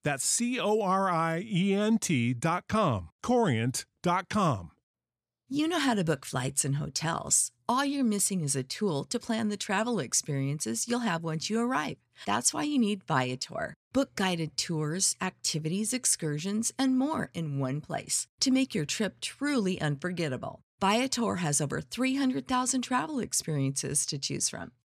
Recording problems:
none

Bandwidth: 14.5 kHz